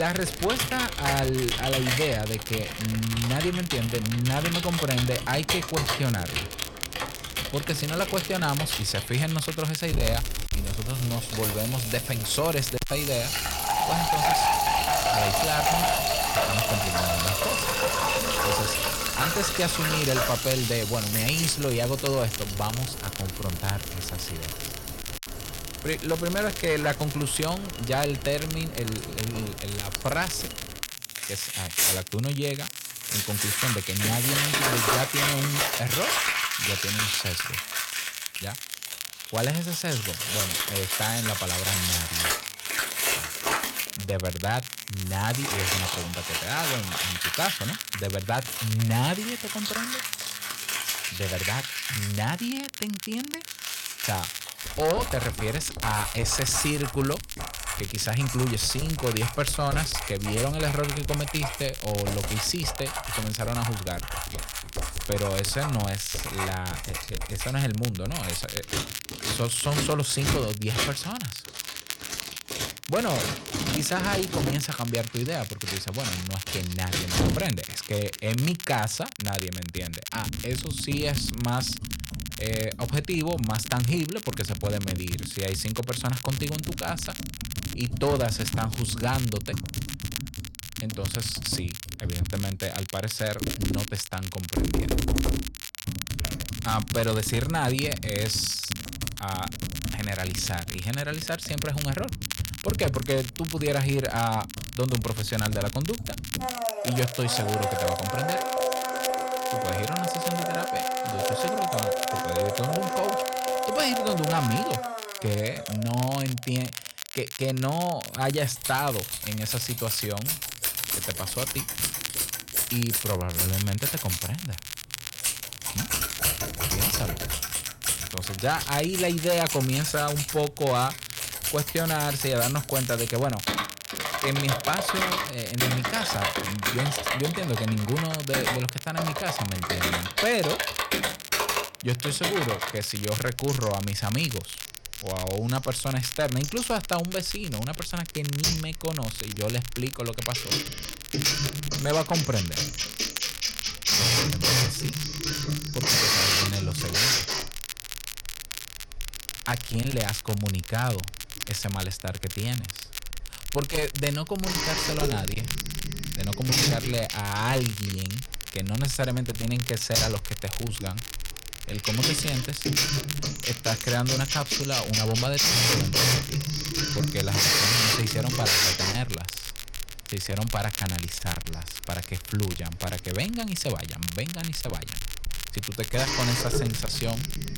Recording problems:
distortion; heavy; 5% of the sound clipped
household noises; very loud; throughout; 1 dB above the speech
crackle, like an old record; loud; 6 dB below the speech
abrupt cut into speech; at the start

